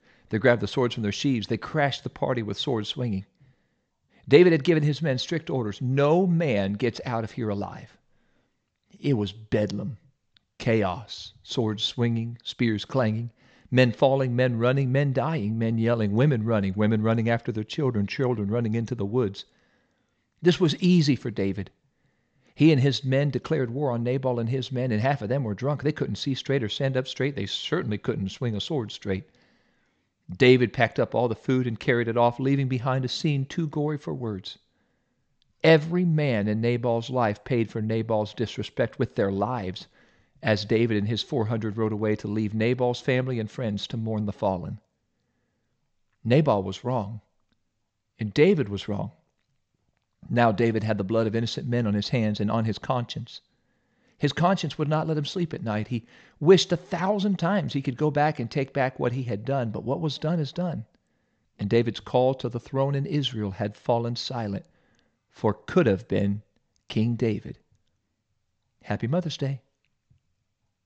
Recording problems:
high frequencies cut off; noticeable; nothing above 8 kHz

